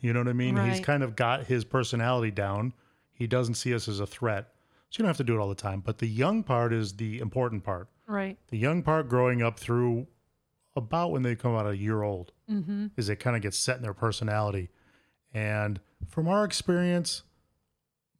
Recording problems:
none

